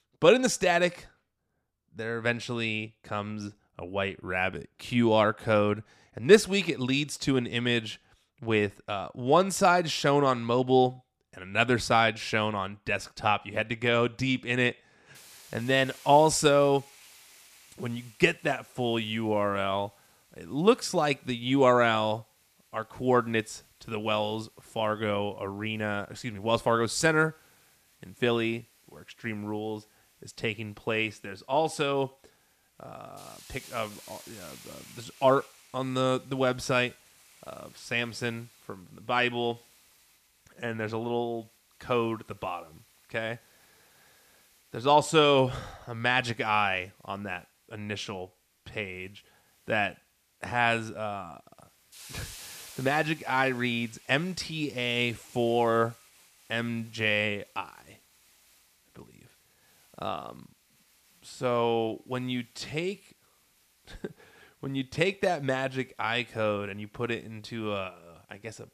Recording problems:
hiss; faint; from 15 s on; 25 dB below the speech

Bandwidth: 14.5 kHz